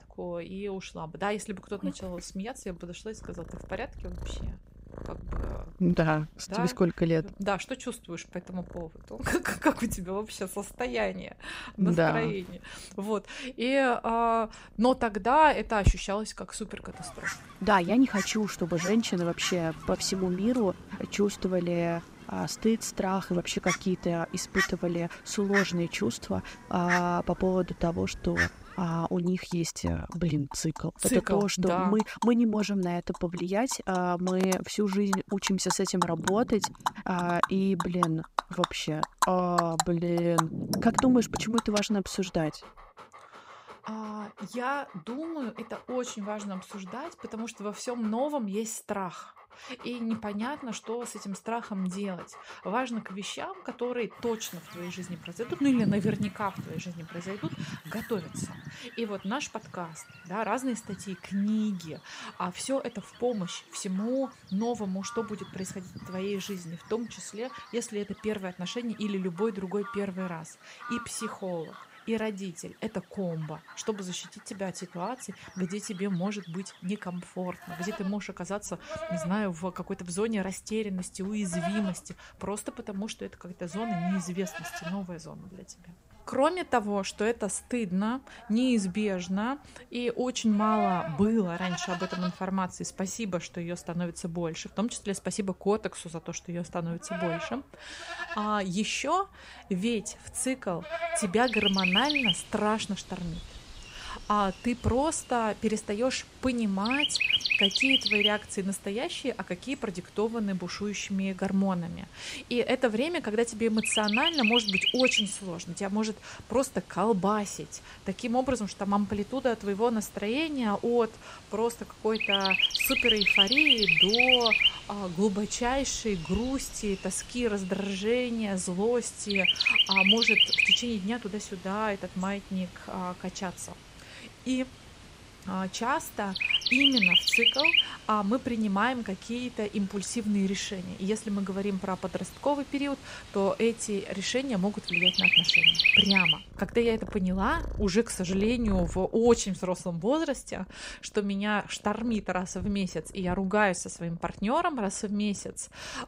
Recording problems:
animal sounds; very loud; throughout; 4 dB above the speech

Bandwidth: 15.5 kHz